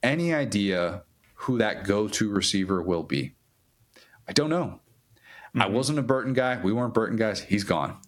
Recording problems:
squashed, flat; heavily

